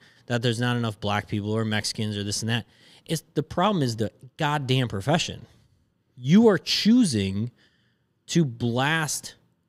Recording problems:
none

